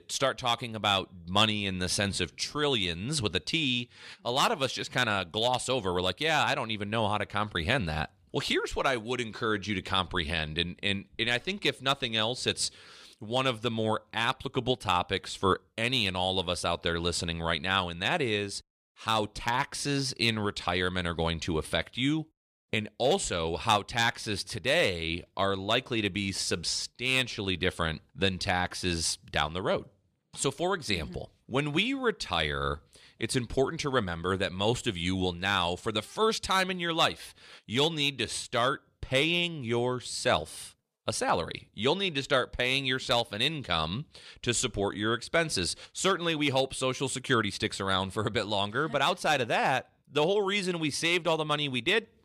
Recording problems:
none

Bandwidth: 15.5 kHz